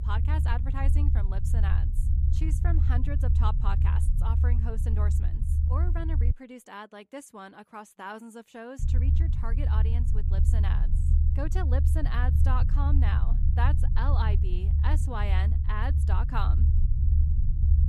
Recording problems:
low rumble; loud; until 6.5 s and from 9 s on; 5 dB below the speech

